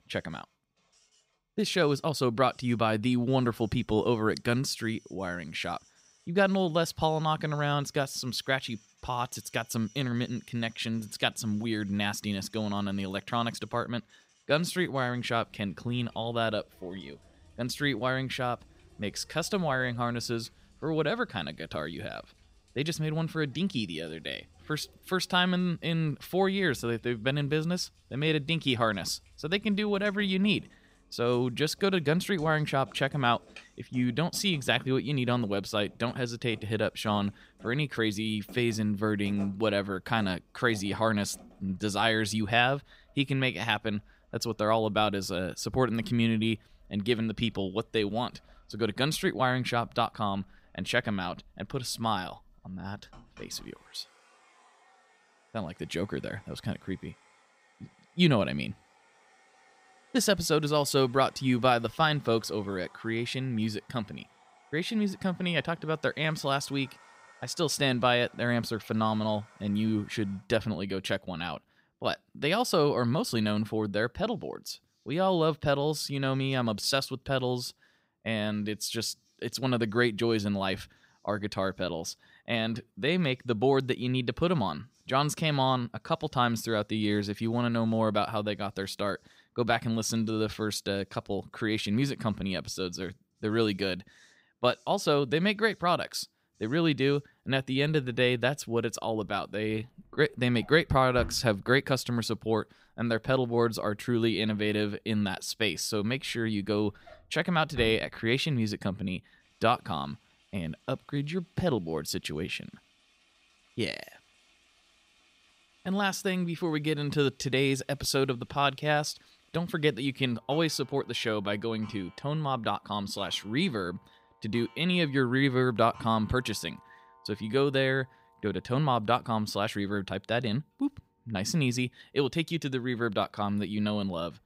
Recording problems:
household noises; faint; throughout; 25 dB below the speech

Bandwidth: 15.5 kHz